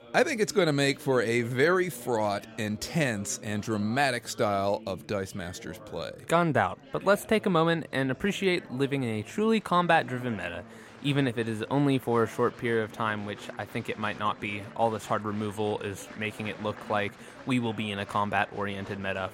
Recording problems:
chatter from many people; noticeable; throughout; 20 dB below the speech

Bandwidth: 16 kHz